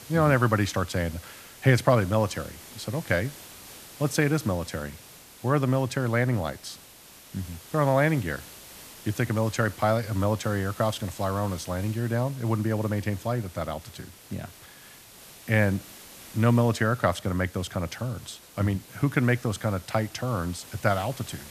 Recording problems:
hiss; noticeable; throughout; 20 dB below the speech

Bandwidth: 14.5 kHz